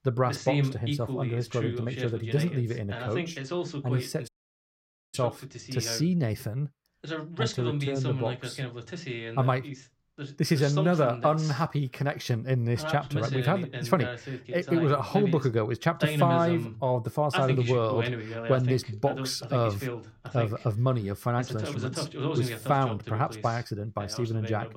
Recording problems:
voice in the background; loud; throughout; 6 dB below the speech
audio cutting out; at 4.5 s for 1 s

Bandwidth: 16 kHz